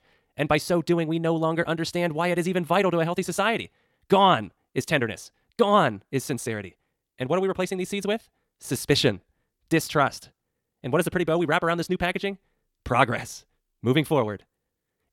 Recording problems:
wrong speed, natural pitch; too fast; 1.7 times normal speed

